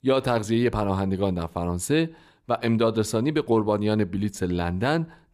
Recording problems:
none

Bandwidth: 14.5 kHz